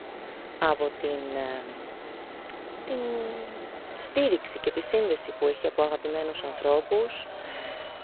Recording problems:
phone-call audio; poor line; nothing above 4 kHz
traffic noise; noticeable; throughout; 10 dB below the speech

